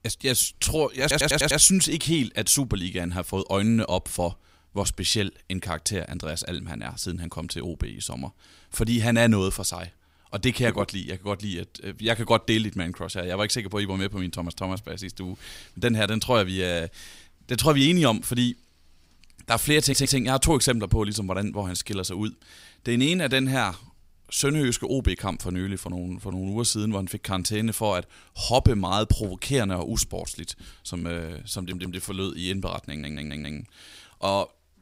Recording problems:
audio stuttering; 4 times, first at 1 s

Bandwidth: 15.5 kHz